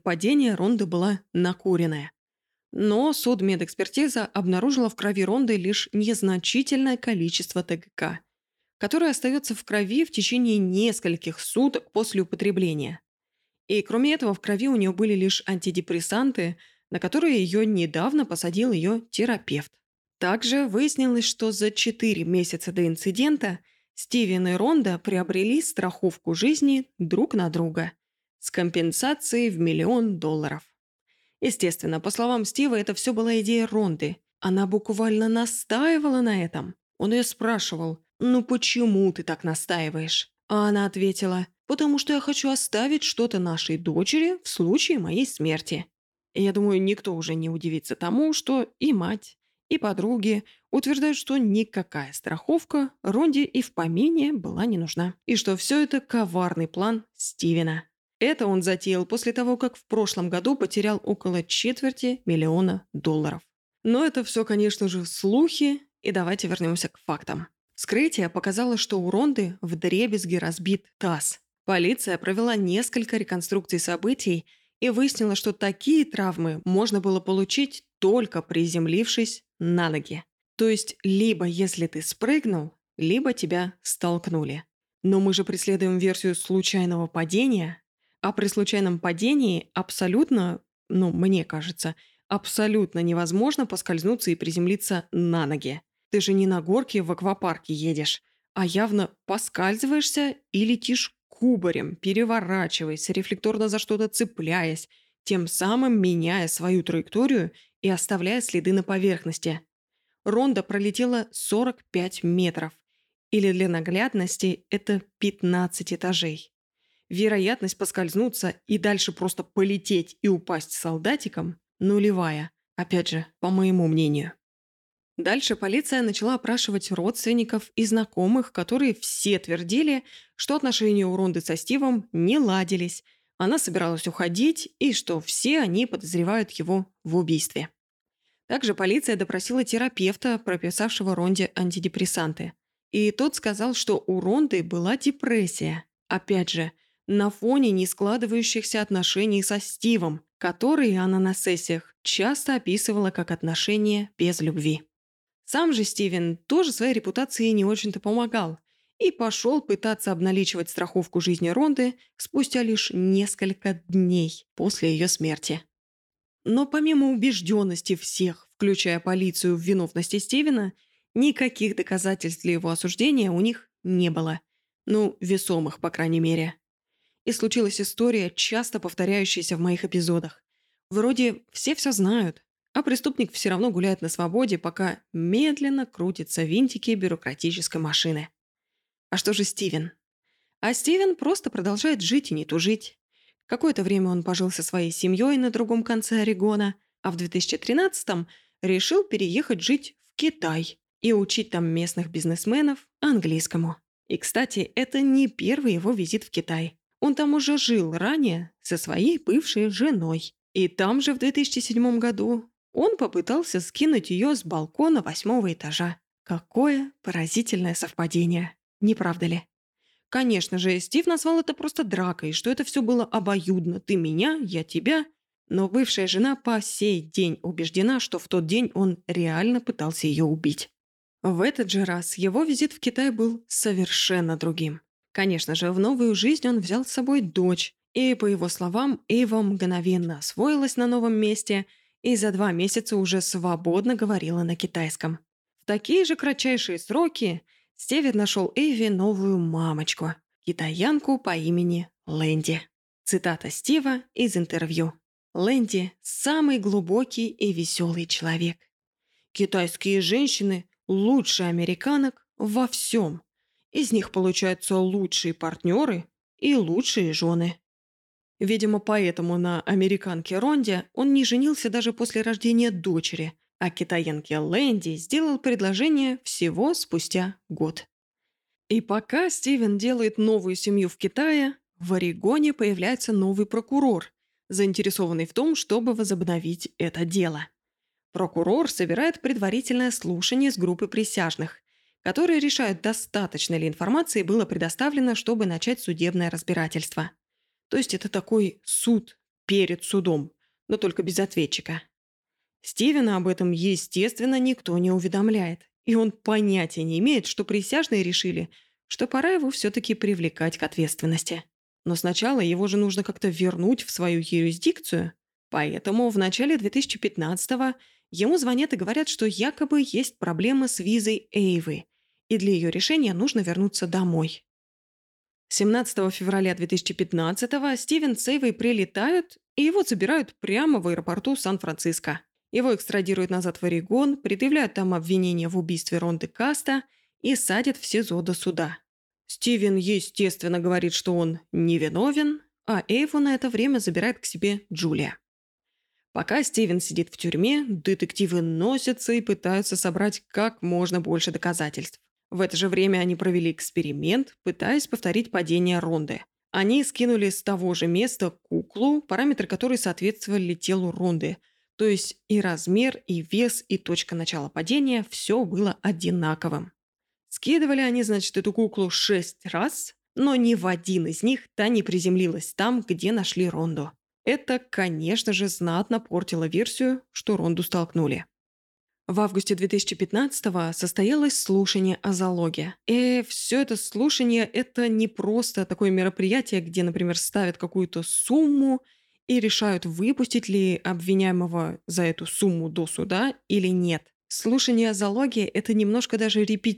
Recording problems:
none

